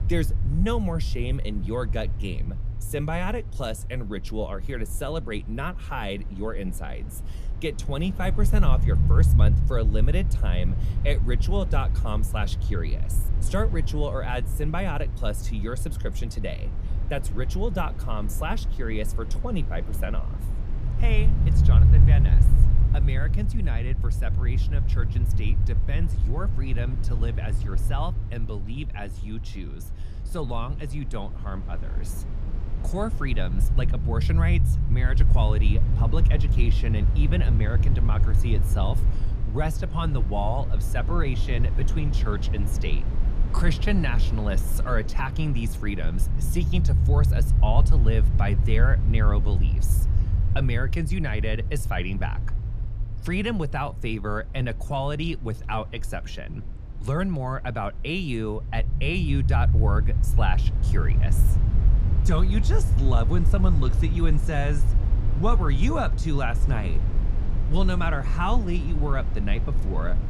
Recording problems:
low rumble; loud; throughout; 9 dB below the speech

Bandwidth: 14.5 kHz